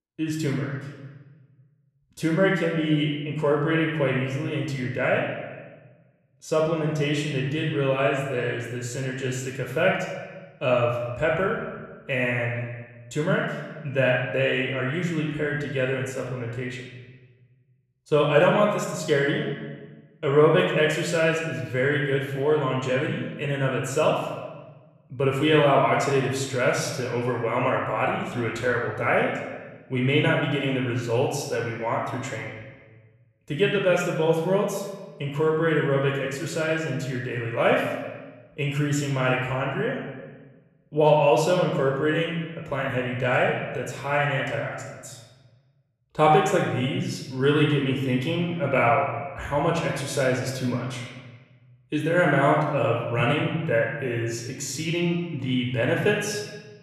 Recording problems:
room echo; noticeable; dies away in 1.2 s
off-mic speech; somewhat distant

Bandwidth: 14 kHz